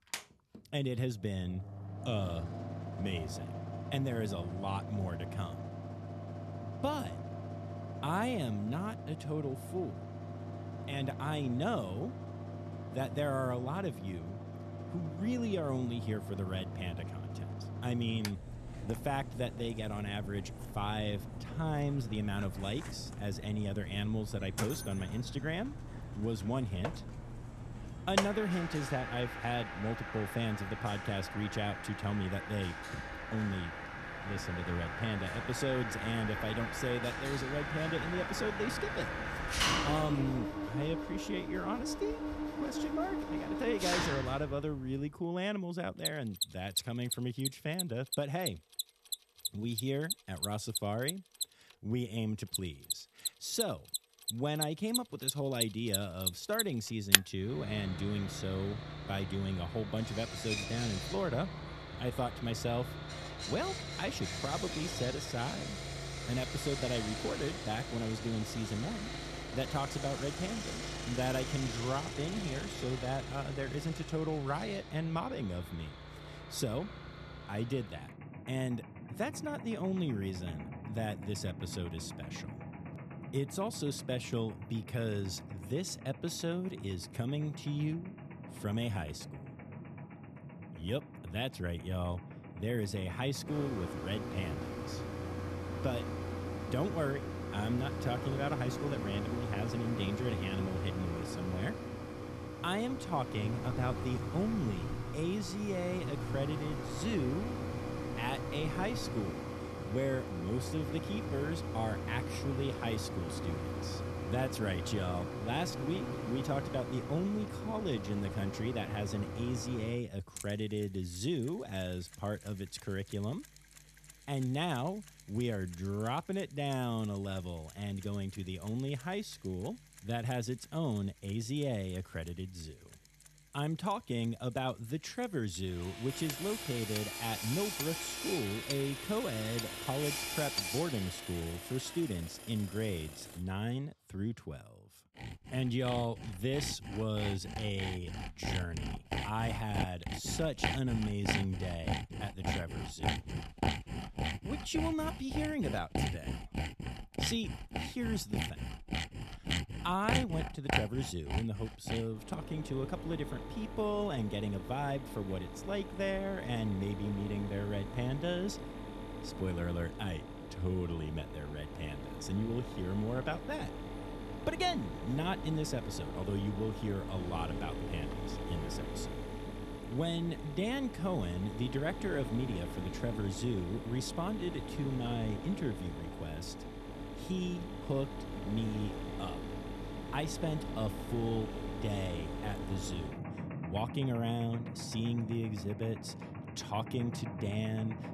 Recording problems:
machinery noise; loud; throughout; 3 dB below the speech

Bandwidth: 13.5 kHz